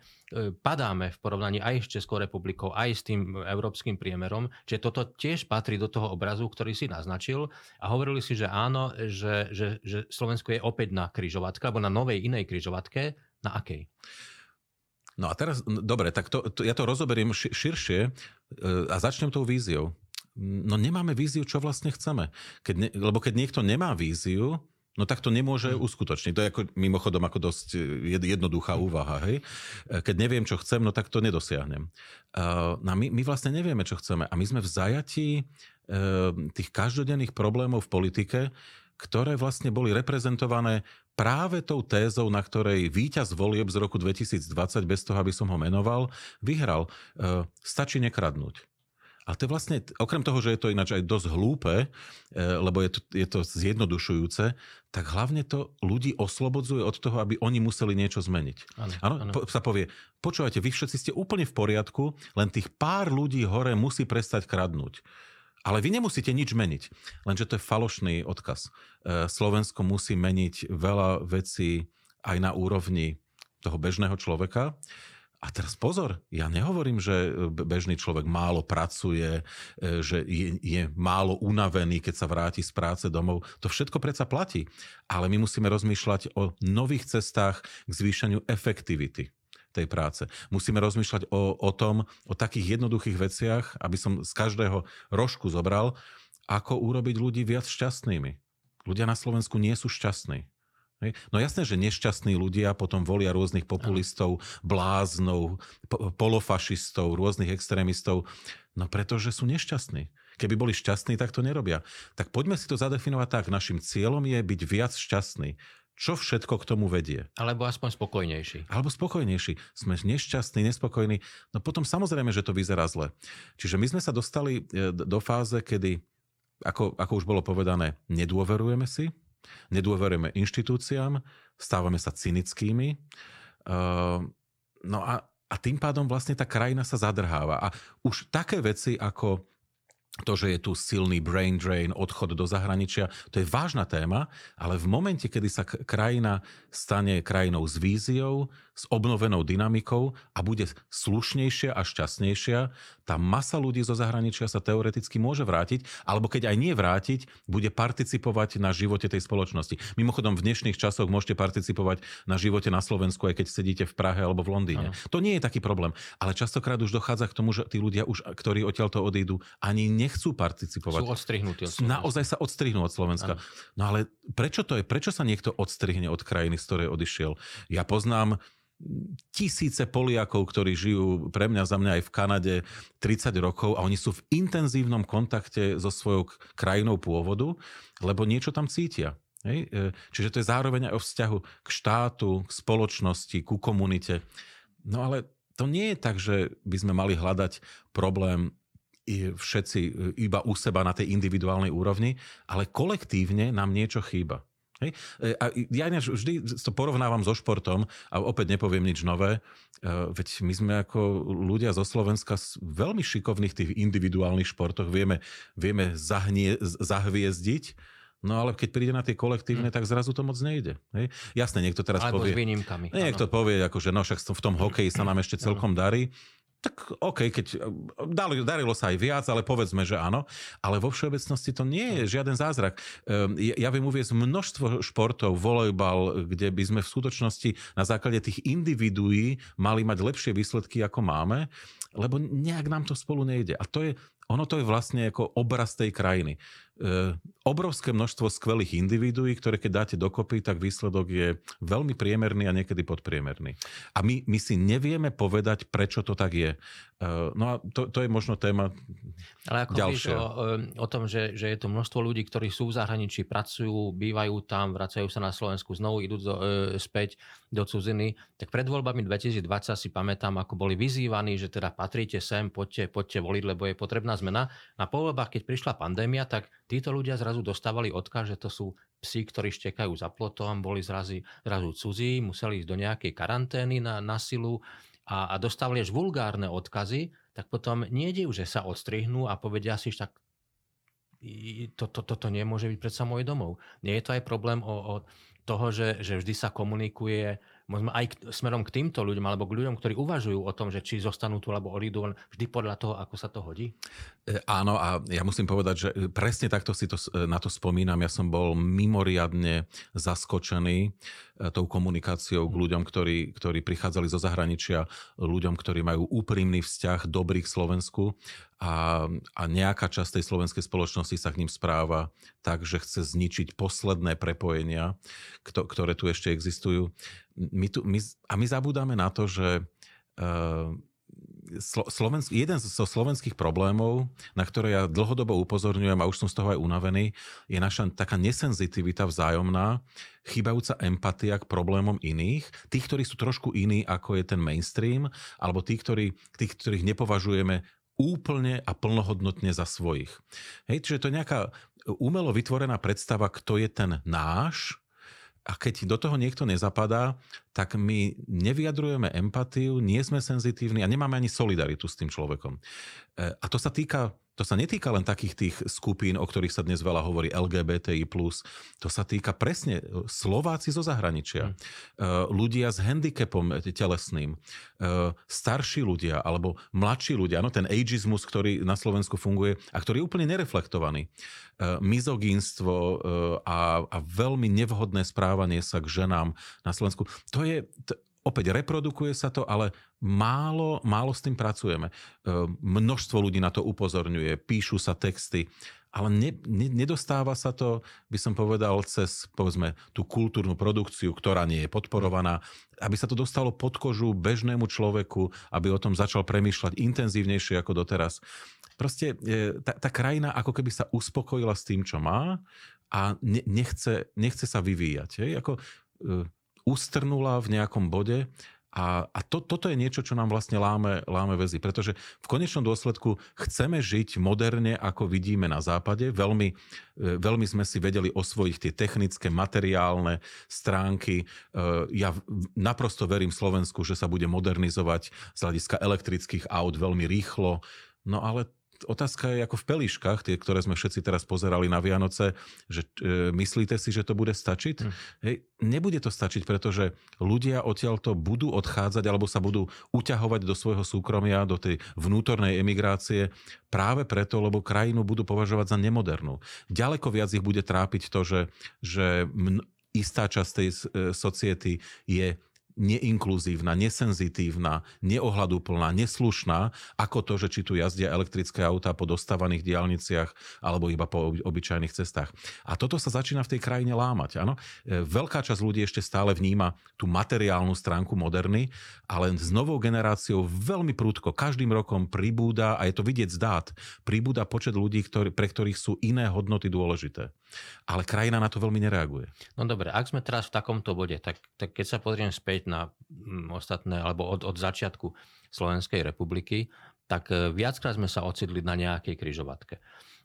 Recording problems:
none

